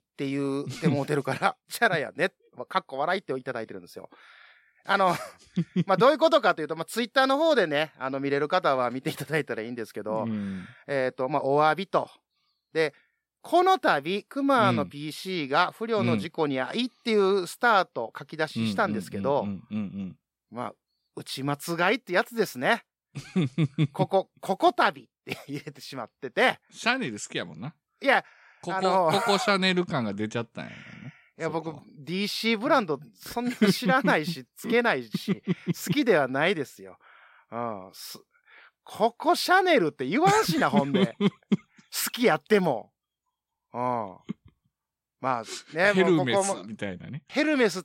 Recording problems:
none

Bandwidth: 16 kHz